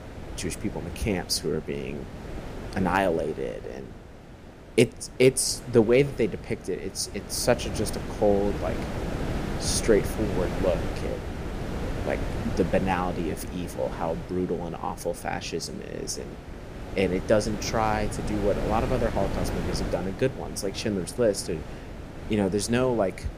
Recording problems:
wind noise on the microphone; occasional gusts; 10 dB below the speech

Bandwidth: 15 kHz